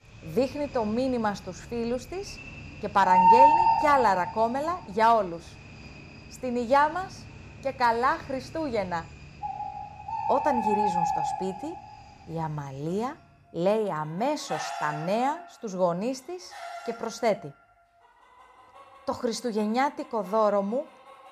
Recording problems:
animal sounds; very loud; throughout; 2 dB above the speech

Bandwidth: 15 kHz